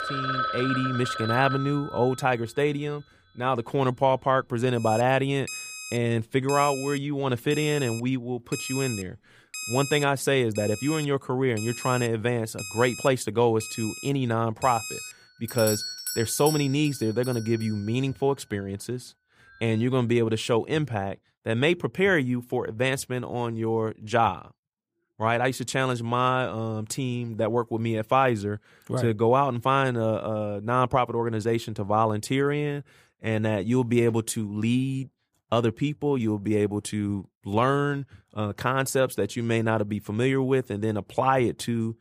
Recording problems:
alarms or sirens; loud; until 20 s; 8 dB below the speech

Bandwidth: 15 kHz